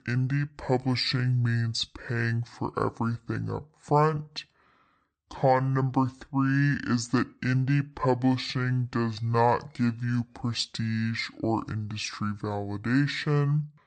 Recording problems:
wrong speed and pitch; too slow and too low; 0.6 times normal speed

